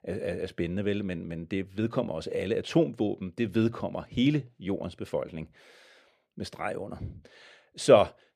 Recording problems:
muffled; slightly; fading above 4 kHz

